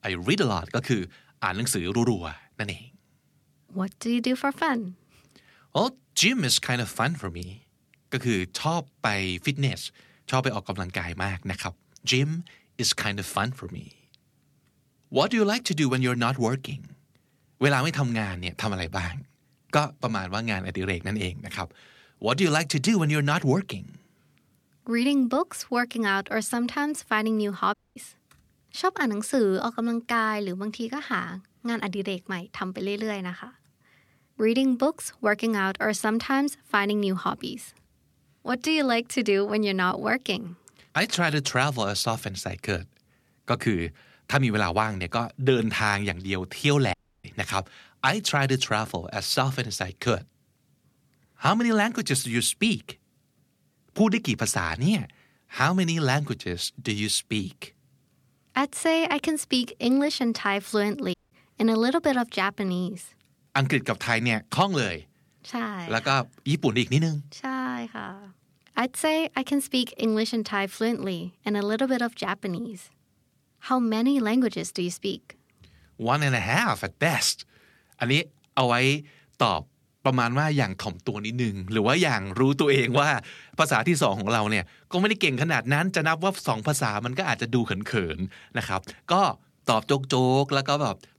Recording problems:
audio cutting out; at 28 s, at 47 s and at 1:01

